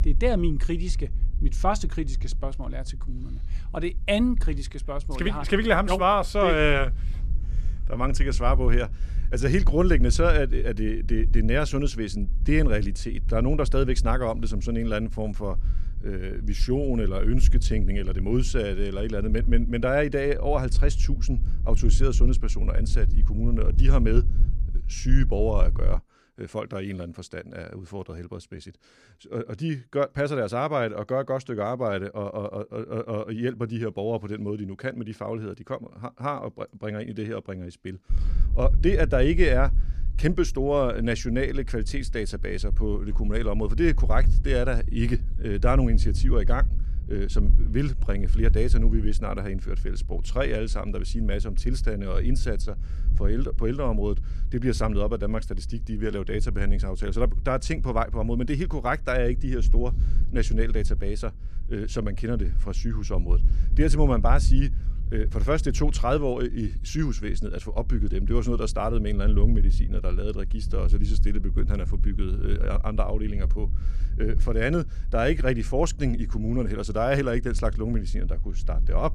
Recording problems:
low rumble; faint; until 26 s and from 38 s on; 20 dB below the speech

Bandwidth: 14 kHz